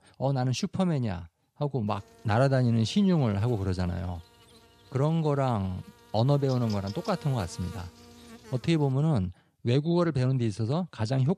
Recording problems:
electrical hum; noticeable; from 2 to 9 s; 60 Hz, 20 dB below the speech

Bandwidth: 14 kHz